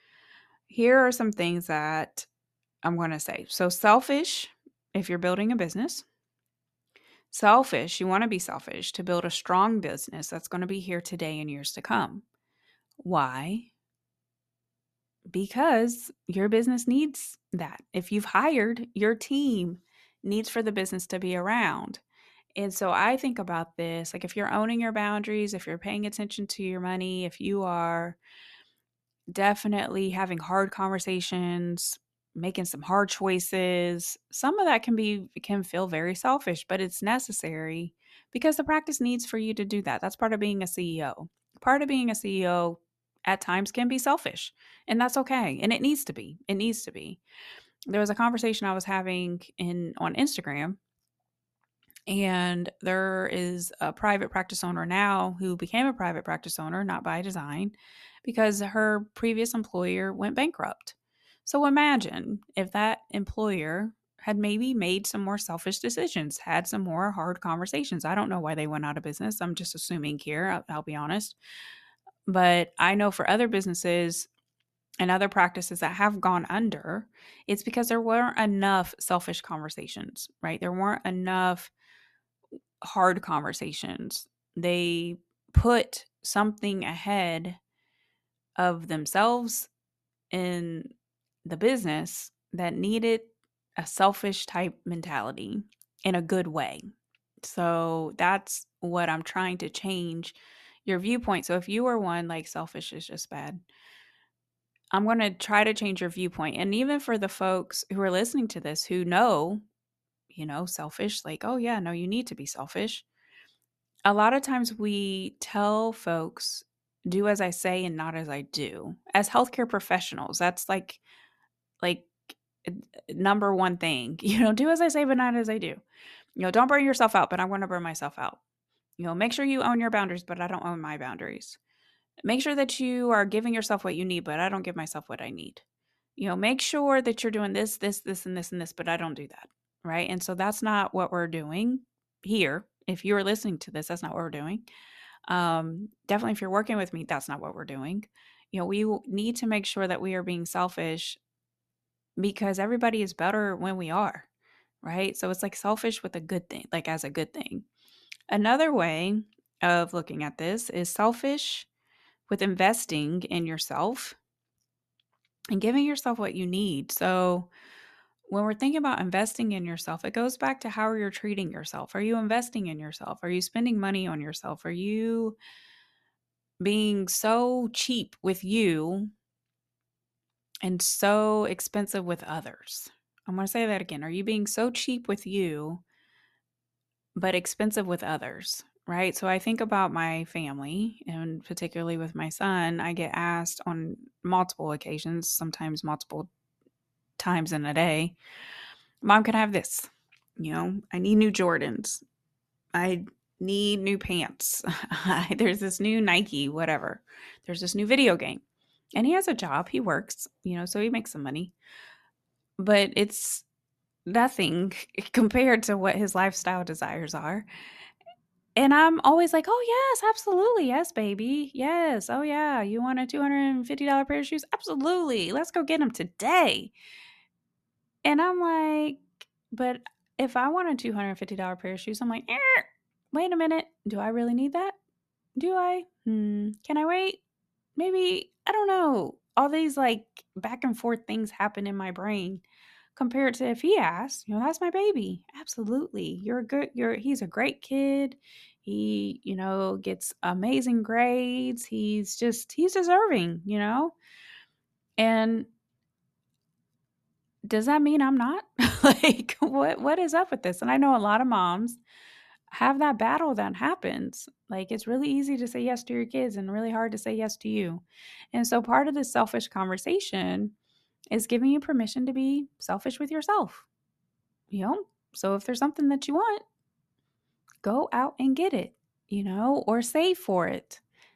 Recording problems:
none

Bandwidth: 13.5 kHz